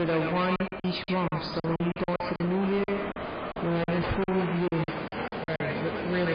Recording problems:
distortion; heavy; 19% of the sound clipped
echo of what is said; strong; throughout; 120 ms later, 7 dB below the speech
garbled, watery; badly; nothing above 5 kHz
train or aircraft noise; loud; throughout; 6 dB below the speech
choppy; very; 14% of the speech affected
abrupt cut into speech; at the start and the end

